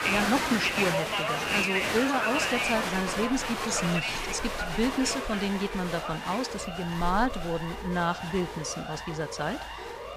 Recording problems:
crowd noise; very loud; throughout; 1 dB above the speech
siren; noticeable; from 2 s on; peak 8 dB below the speech

